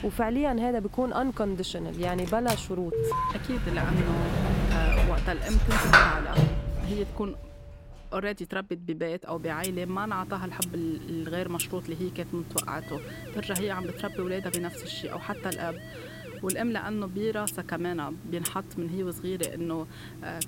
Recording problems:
household noises; very loud; throughout; 3 dB above the speech
alarm; loud; at 3 s; peak 4 dB above the speech
doorbell; faint; from 6.5 to 8 s; peak 10 dB below the speech
siren; faint; from 13 to 16 s; peak 10 dB below the speech

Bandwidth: 16 kHz